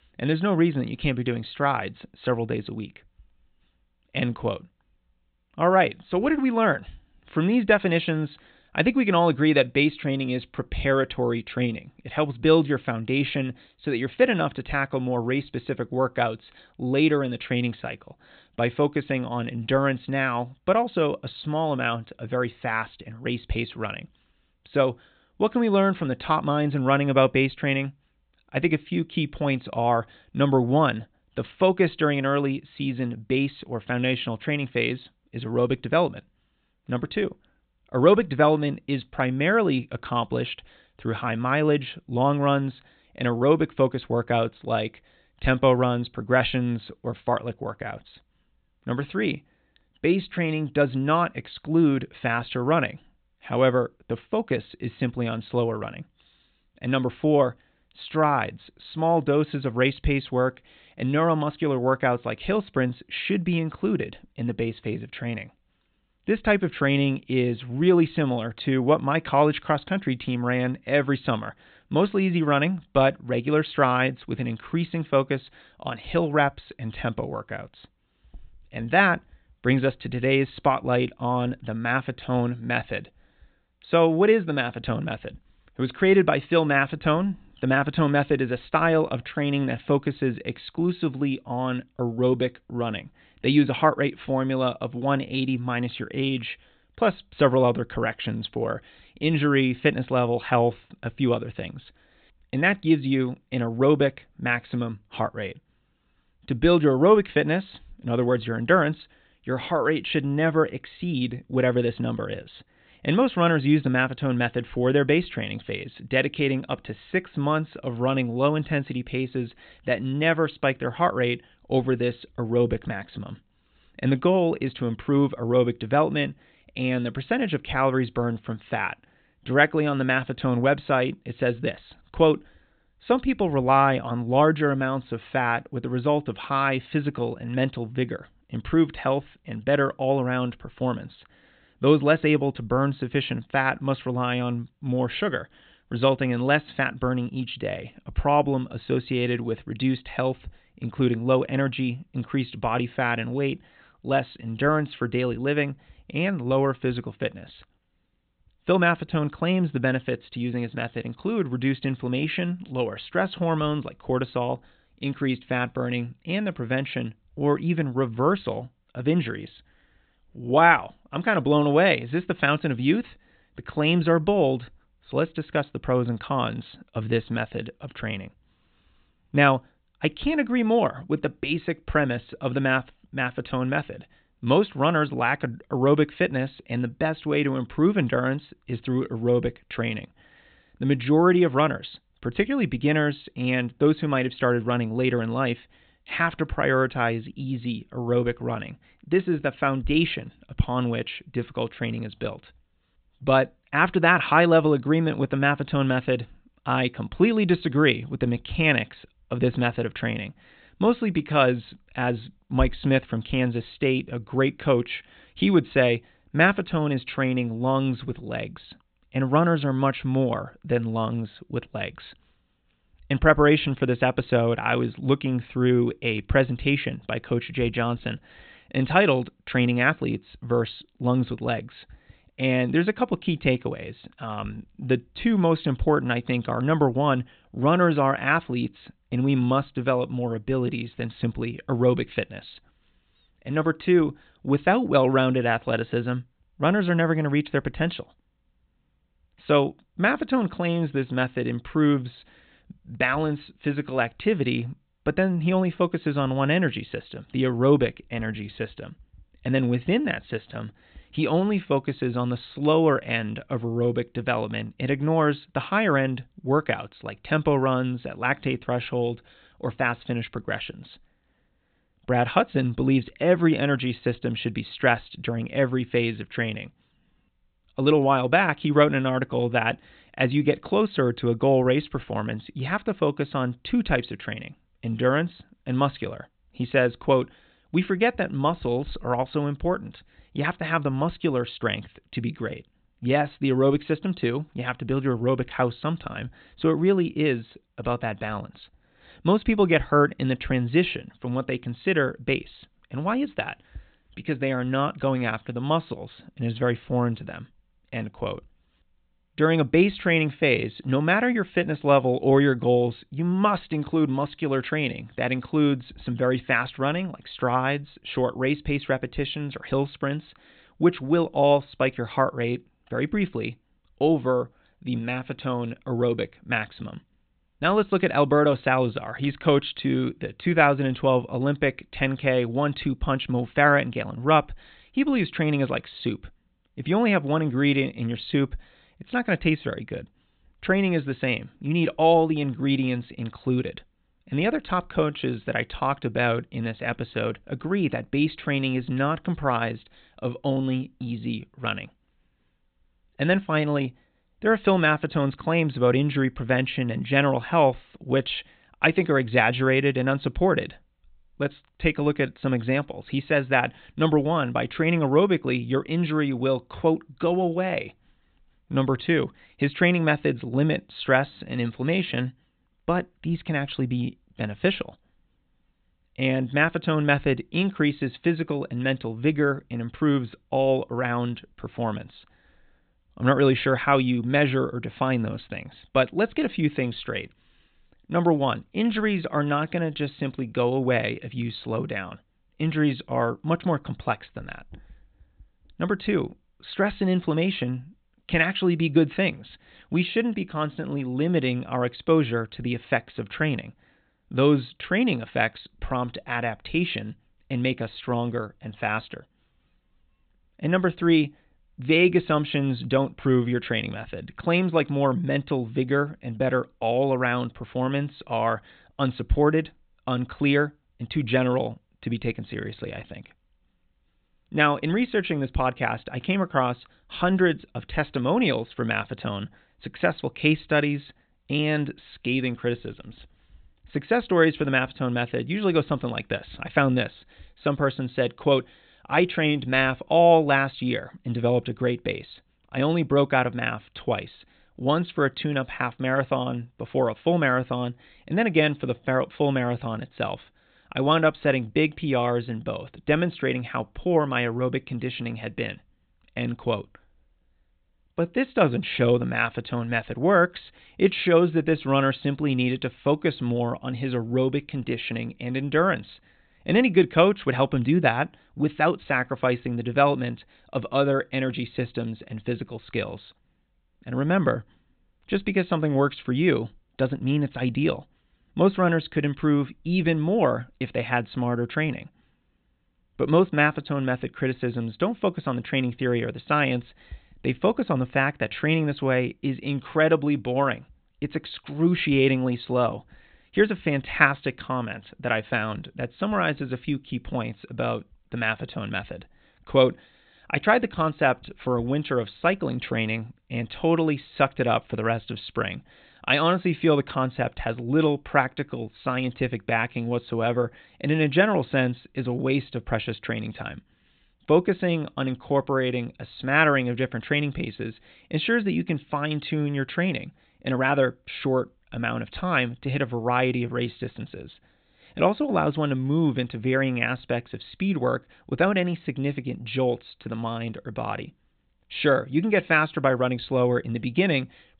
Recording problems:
high frequencies cut off; severe; nothing above 4 kHz

